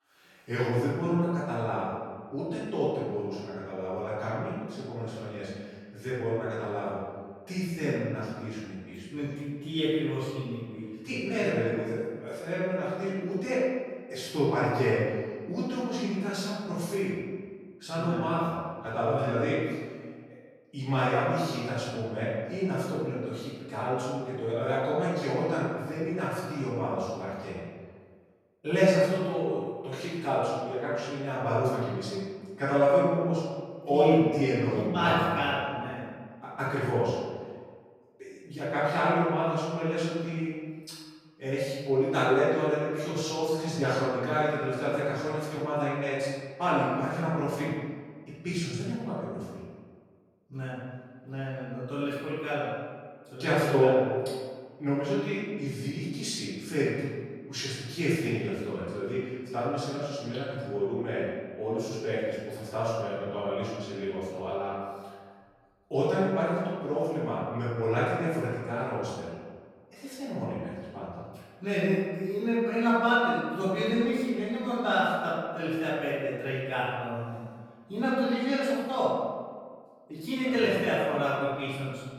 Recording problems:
room echo; strong; dies away in 1.4 s
off-mic speech; far

